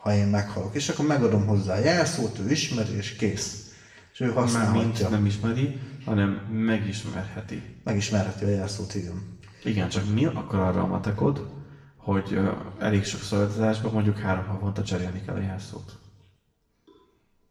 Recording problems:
off-mic speech; far
room echo; slight; dies away in 0.9 s

